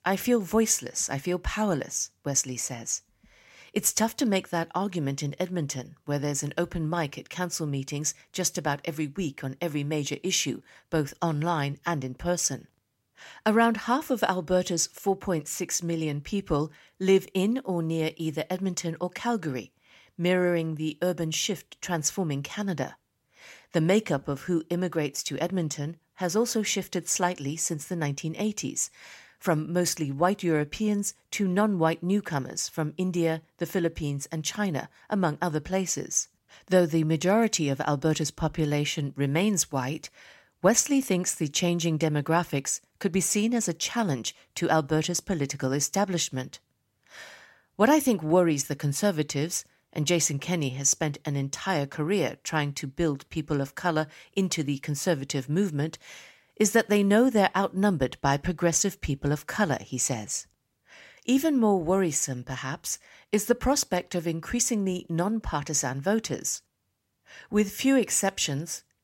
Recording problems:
none

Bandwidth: 16 kHz